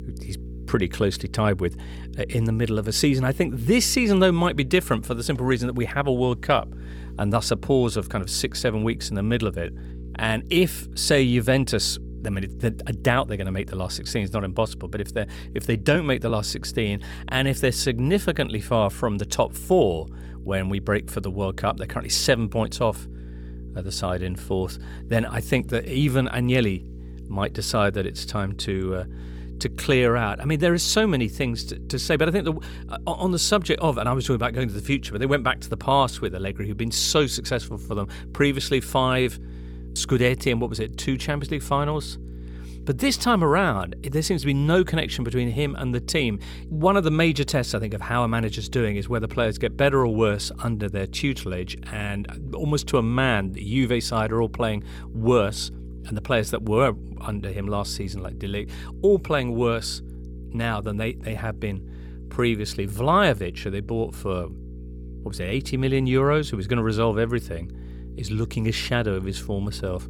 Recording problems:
electrical hum; faint; throughout; 60 Hz, 25 dB below the speech

